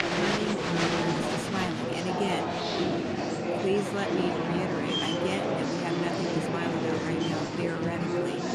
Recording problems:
murmuring crowd; very loud; throughout; 4 dB above the speech

